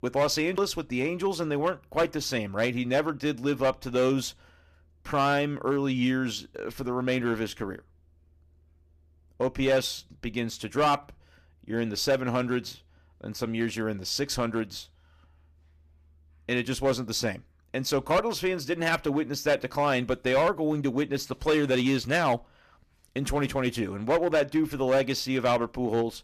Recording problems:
distortion; slight; 4% of the sound clipped

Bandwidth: 14.5 kHz